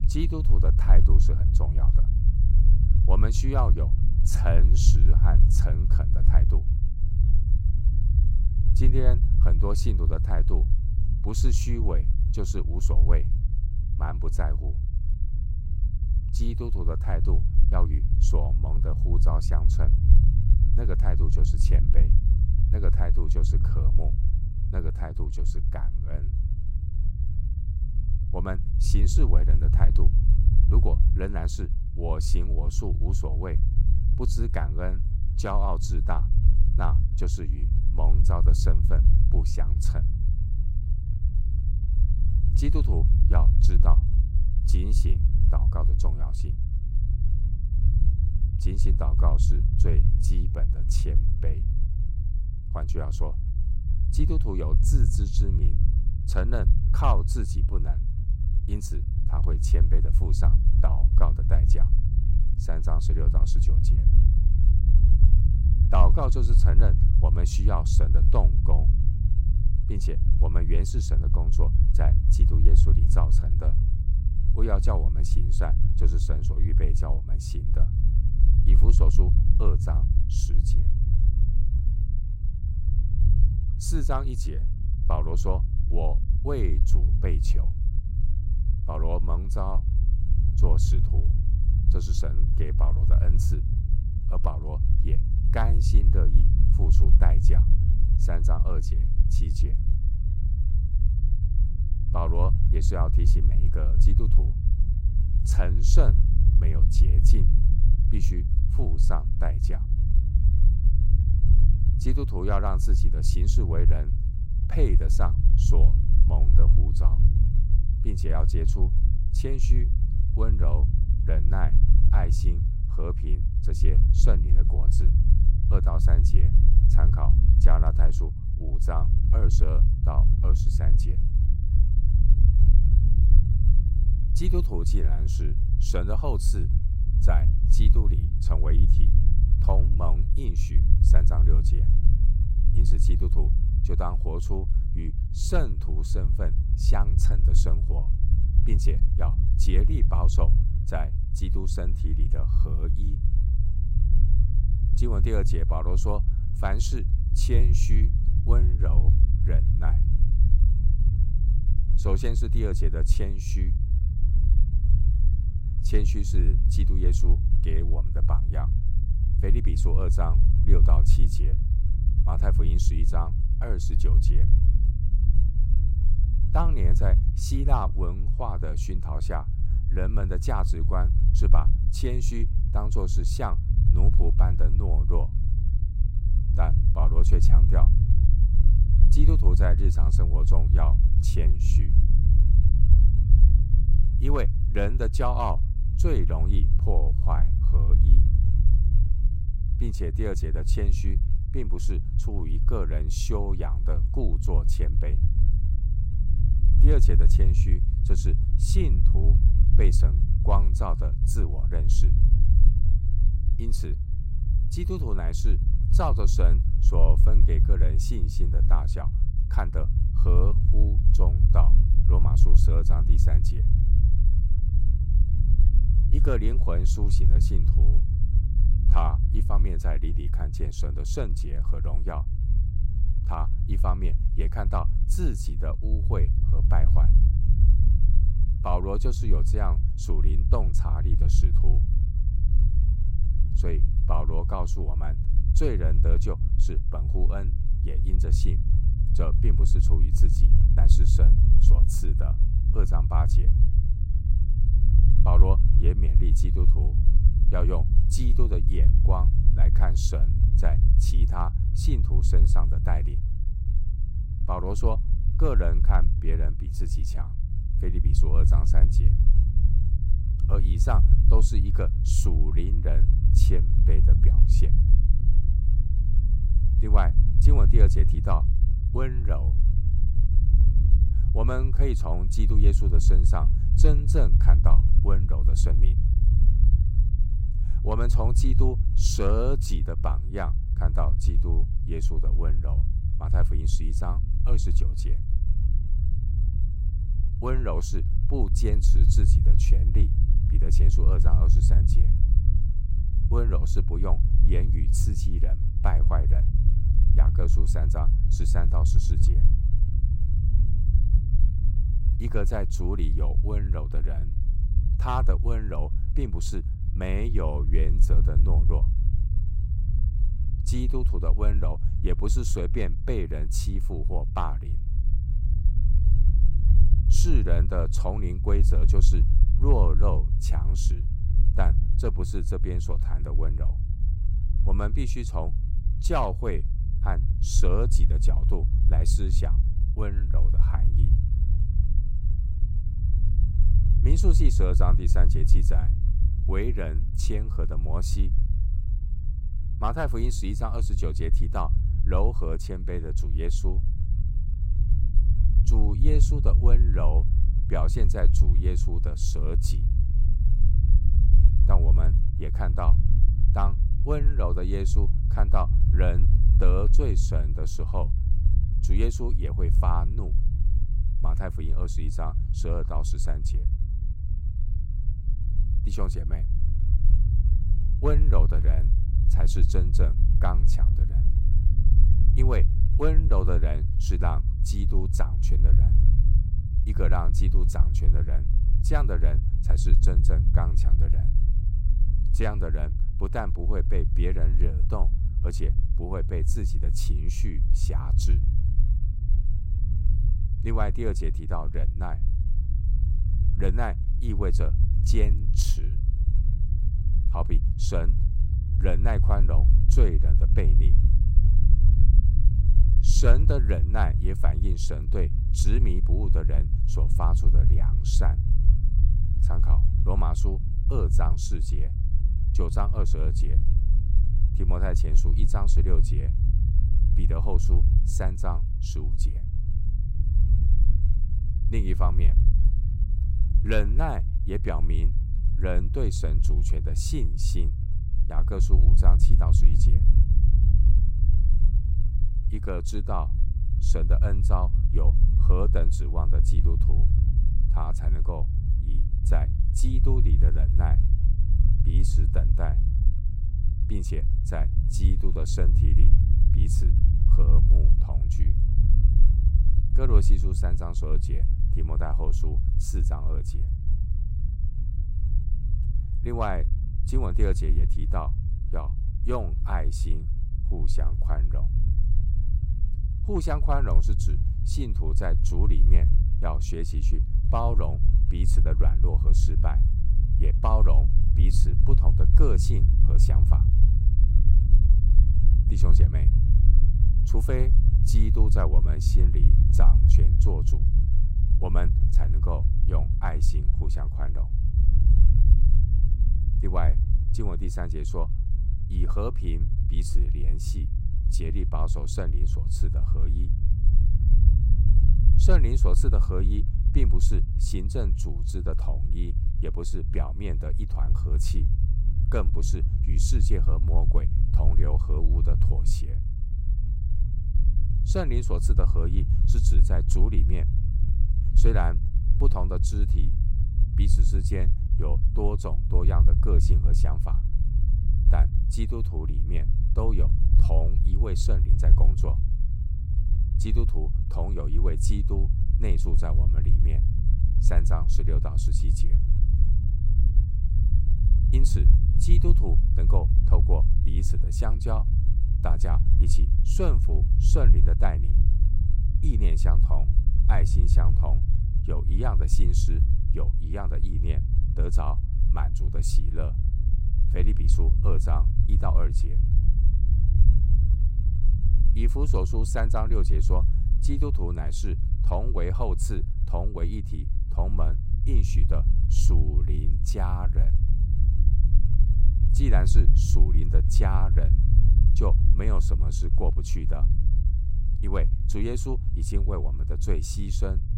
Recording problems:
low rumble; loud; throughout; 6 dB below the speech

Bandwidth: 16 kHz